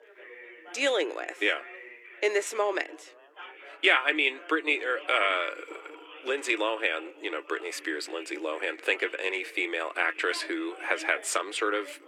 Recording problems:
thin; very; fading below 300 Hz
background chatter; noticeable; throughout; 4 voices, 20 dB below the speech

